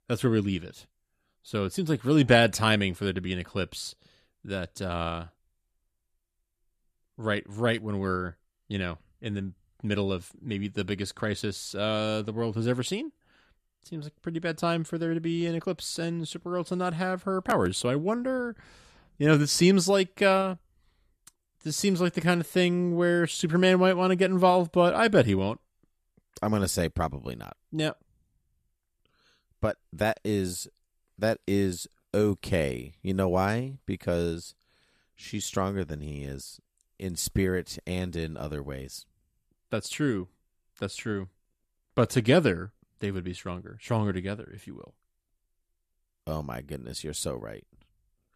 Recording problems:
none

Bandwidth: 14.5 kHz